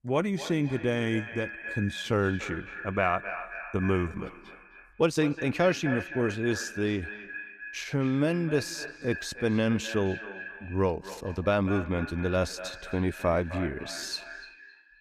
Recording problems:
echo of what is said; strong; throughout; 260 ms later, 10 dB below the speech
uneven, jittery; strongly; from 1.5 to 14 s

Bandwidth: 14.5 kHz